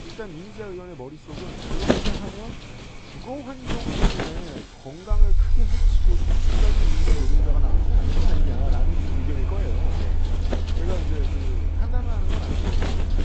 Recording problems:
high frequencies cut off; noticeable; nothing above 8 kHz
garbled, watery; slightly
traffic noise; very loud; throughout; 1 dB above the speech
wind noise on the microphone; heavy; 6 dB above the speech
low rumble; loud; from 5 s on; 6 dB below the speech

